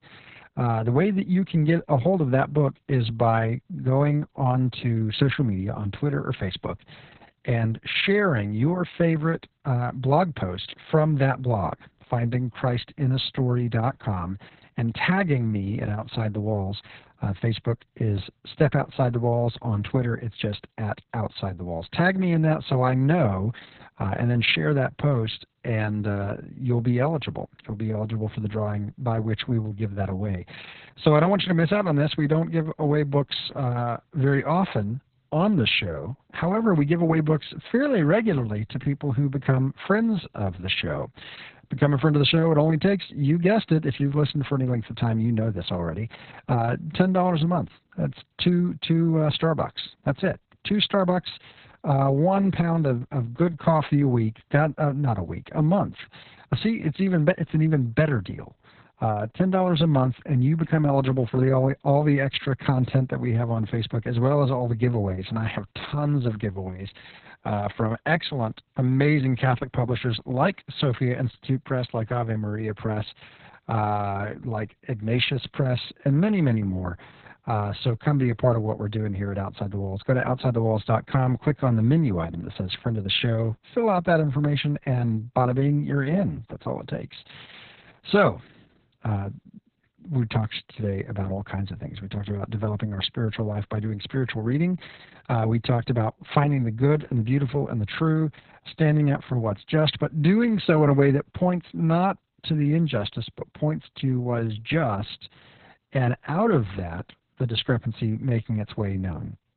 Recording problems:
garbled, watery; badly; nothing above 4 kHz

